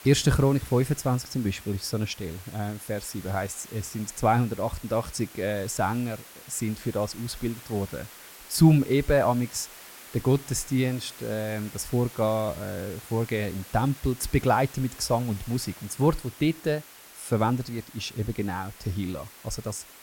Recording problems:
hiss; noticeable; throughout; 15 dB below the speech

